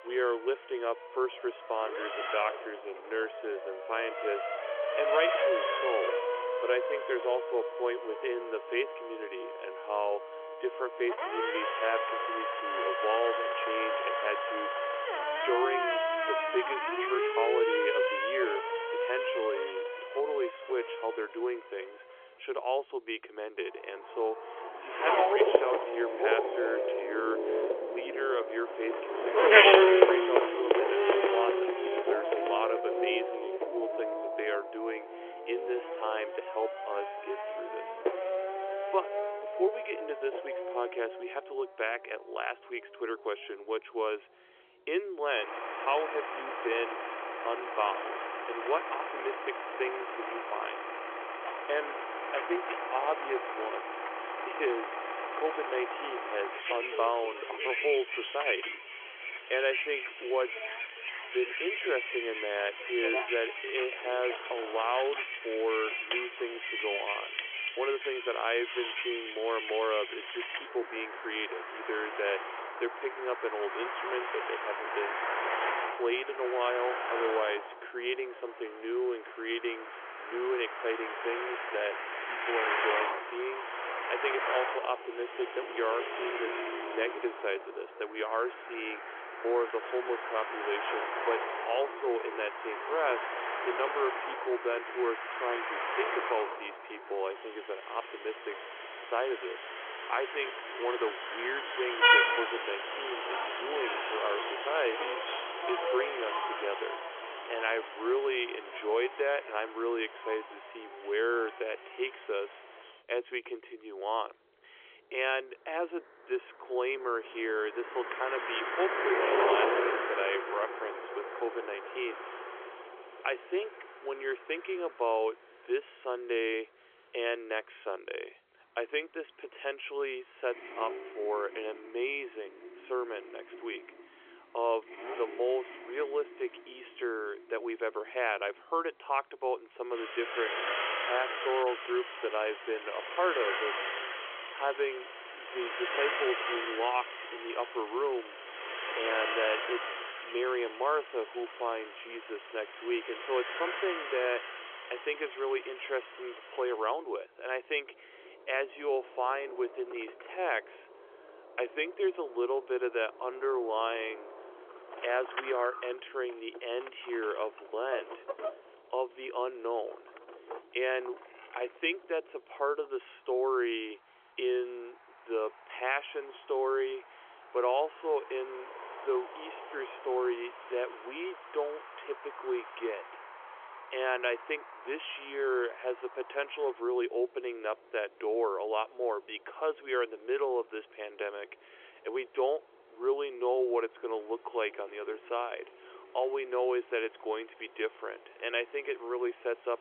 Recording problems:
phone-call audio; nothing above 3.5 kHz
traffic noise; very loud; throughout; 2 dB above the speech

